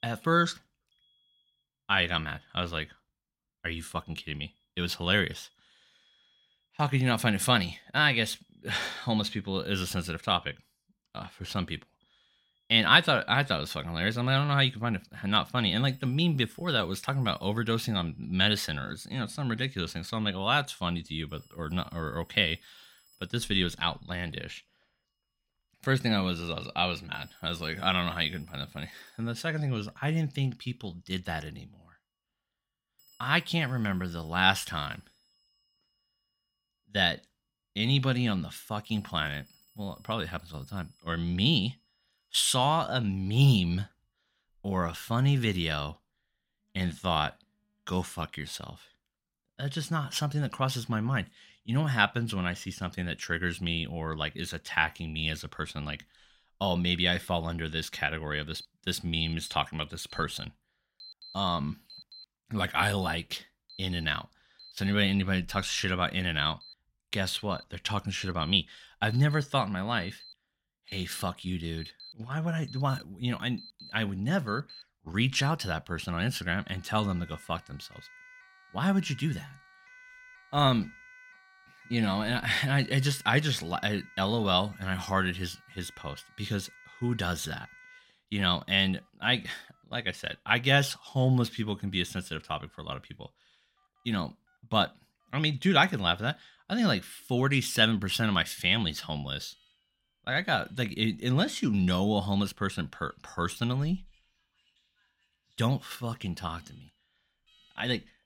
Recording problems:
alarms or sirens; faint; throughout; 25 dB below the speech

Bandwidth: 16 kHz